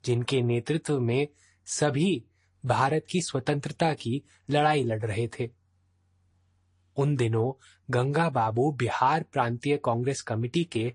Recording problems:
garbled, watery; slightly; nothing above 10.5 kHz

